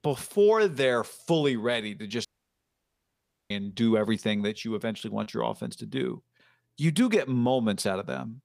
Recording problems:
audio cutting out; at 2.5 s for 1.5 s

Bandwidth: 15 kHz